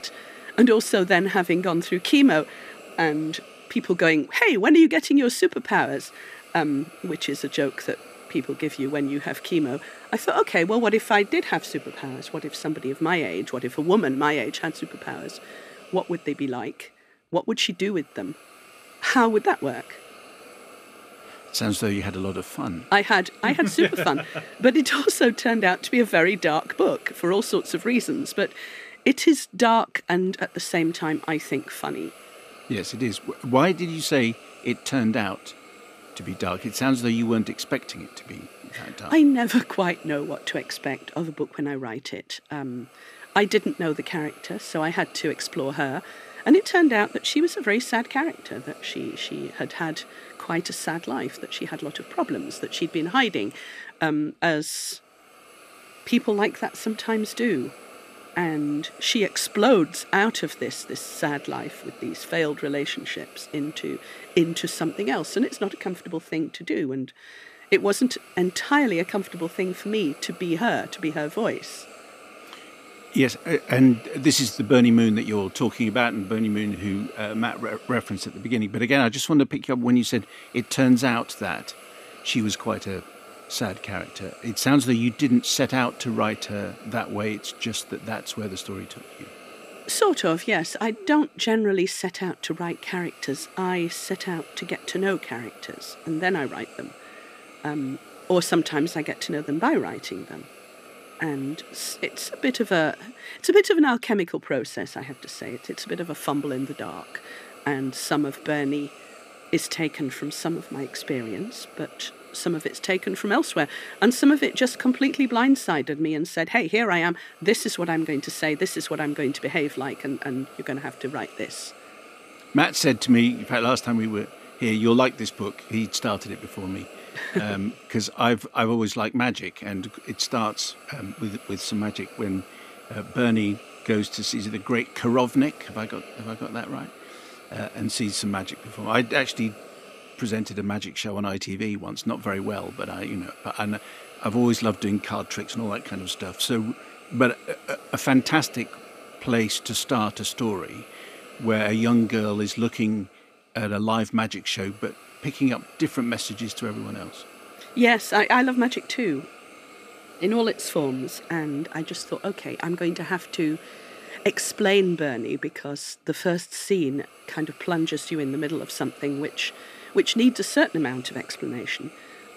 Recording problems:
hiss; faint; throughout; 20 dB below the speech

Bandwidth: 14.5 kHz